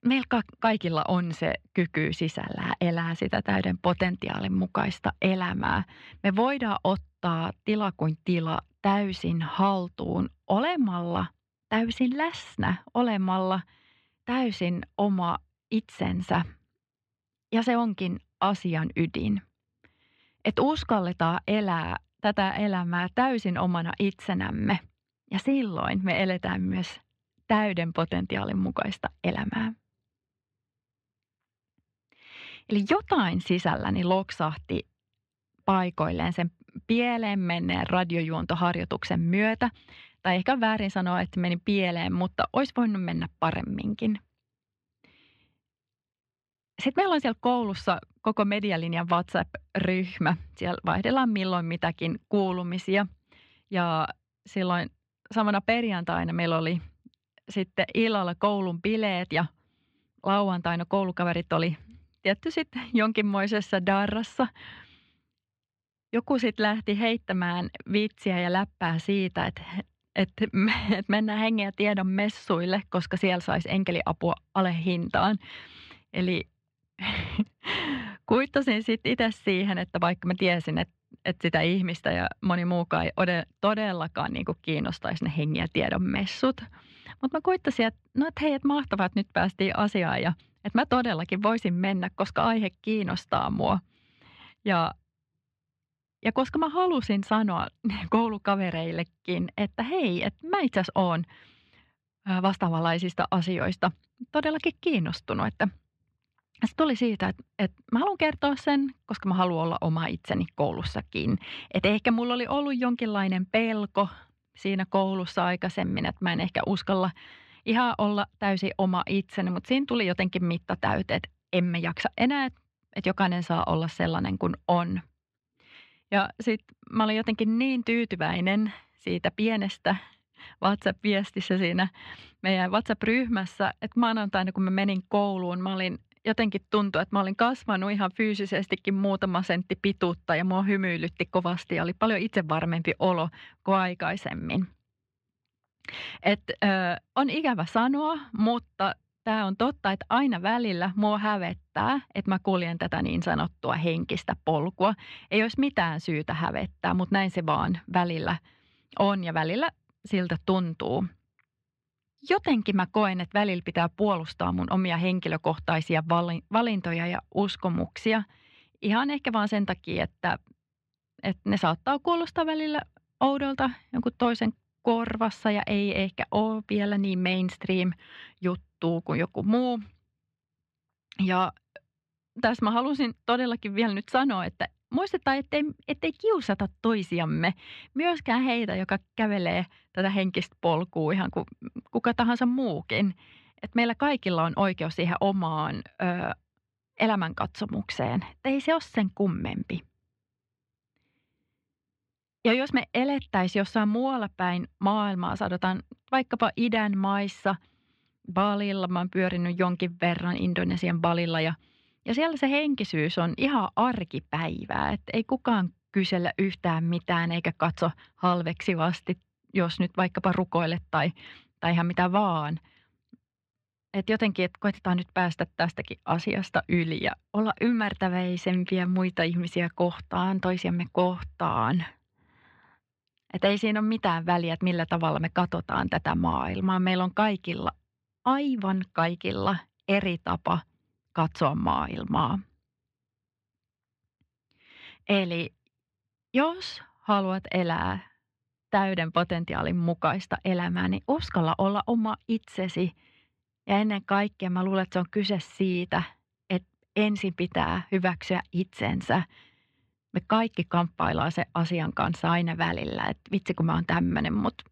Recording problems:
muffled; slightly; fading above 3.5 kHz

